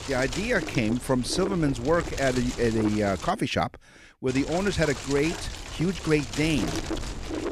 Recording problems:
wind noise on the microphone; heavy; until 3.5 s and from 4.5 s on; 8 dB below the speech

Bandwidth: 14.5 kHz